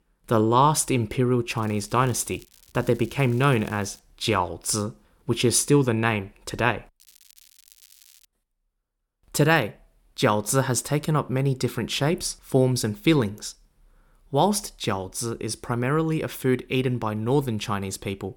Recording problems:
crackling; faint; from 1.5 to 4 s and from 7 to 8.5 s; 25 dB below the speech

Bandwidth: 18 kHz